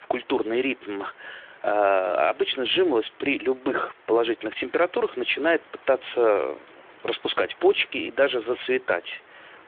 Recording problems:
phone-call audio; nothing above 3.5 kHz
hiss; faint; throughout; 25 dB below the speech

